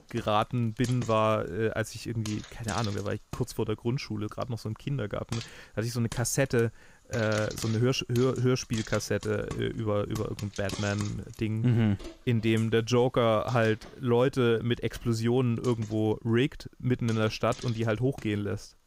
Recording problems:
household noises; noticeable; throughout; 15 dB below the speech

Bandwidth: 15.5 kHz